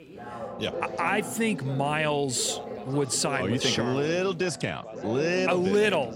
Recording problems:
background chatter; loud; throughout; 3 voices, 10 dB below the speech

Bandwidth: 16 kHz